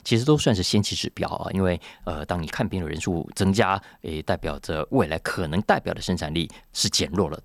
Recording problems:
none

